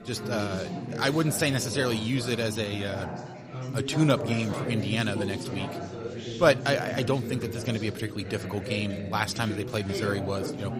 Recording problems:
background chatter; loud; throughout; 4 voices, 7 dB below the speech

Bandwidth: 14.5 kHz